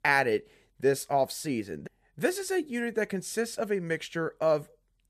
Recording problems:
none

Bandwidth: 14.5 kHz